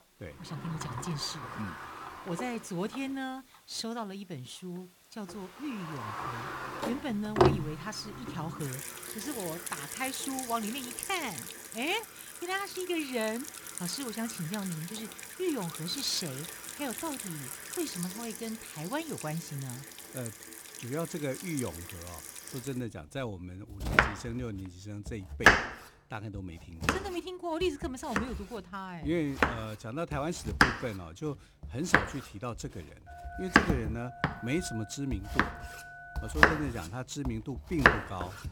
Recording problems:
household noises; very loud; throughout; 4 dB above the speech
phone ringing; noticeable; from 33 to 36 s; peak 7 dB below the speech

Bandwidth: 18 kHz